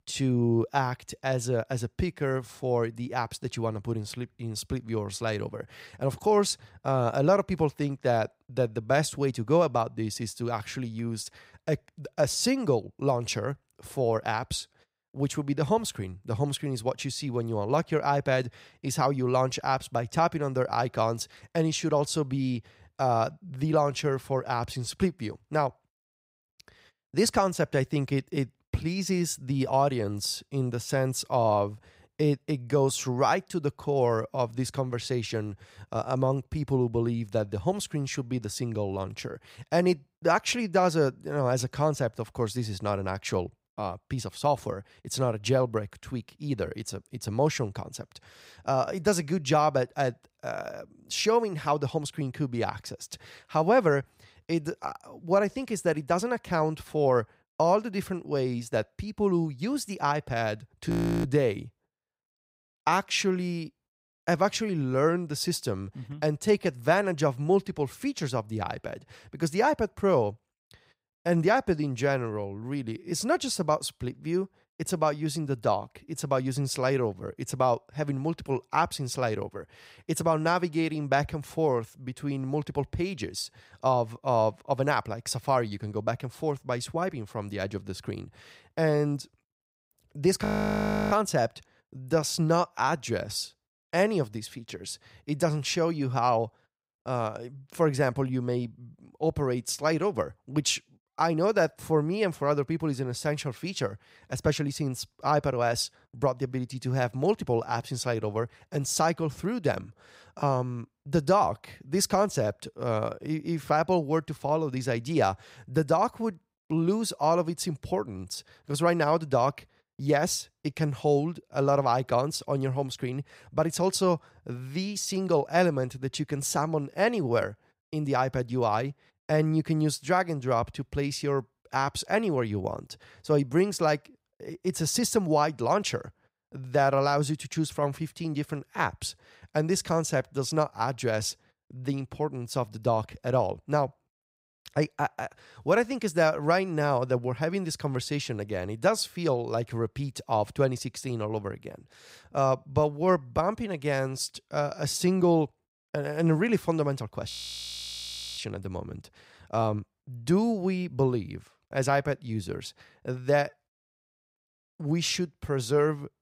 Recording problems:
audio freezing; at 1:01, at 1:30 for 0.5 s and at 2:37 for 1 s

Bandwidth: 15.5 kHz